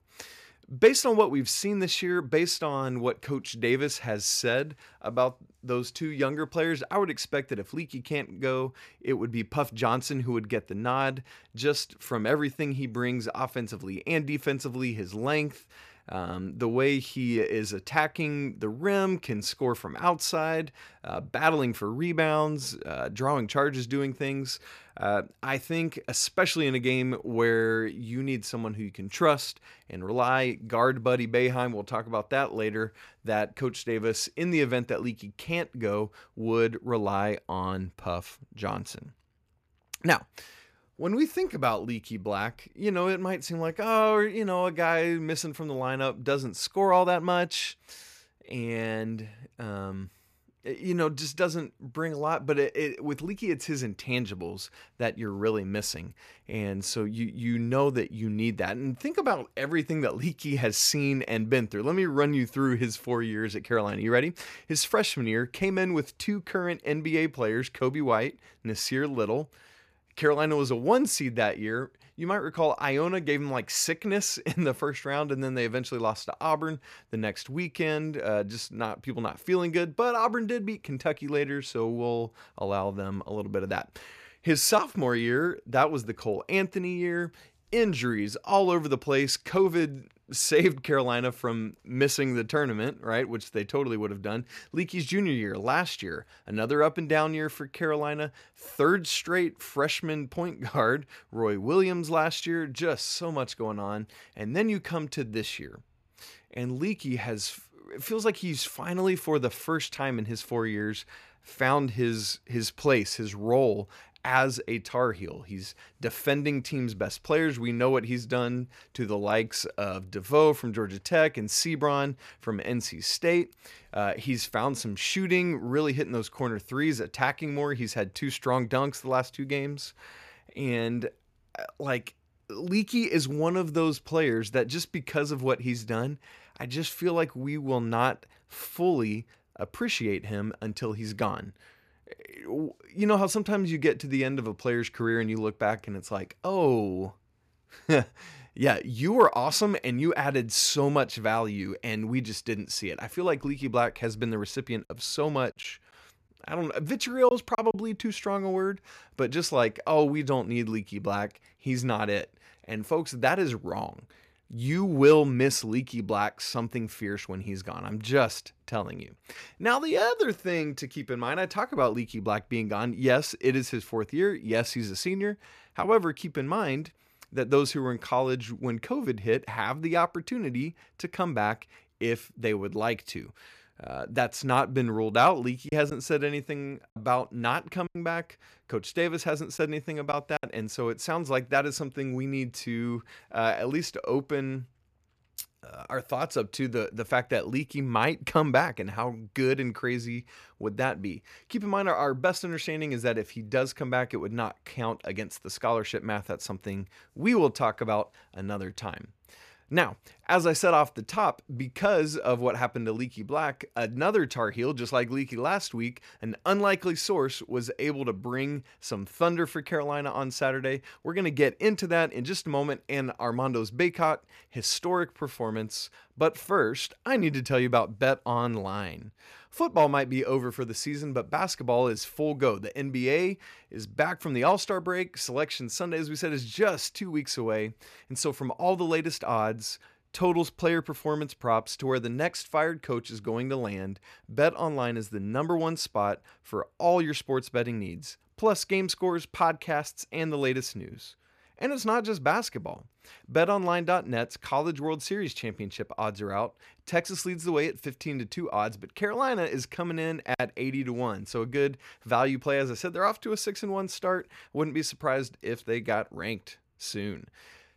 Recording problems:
choppy; very; from 2:36 to 2:38 and from 3:06 to 3:10; 5% of the speech affected

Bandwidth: 14.5 kHz